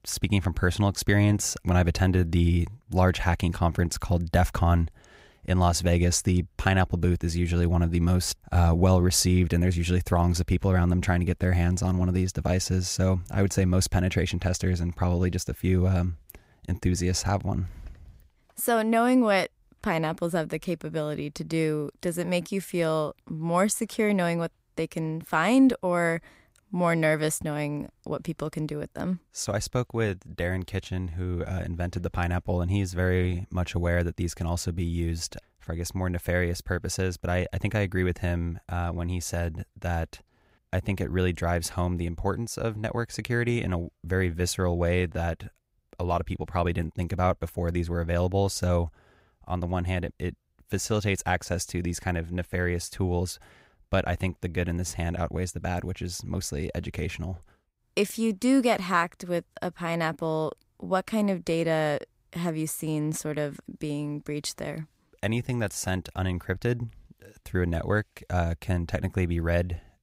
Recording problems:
none

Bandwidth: 15.5 kHz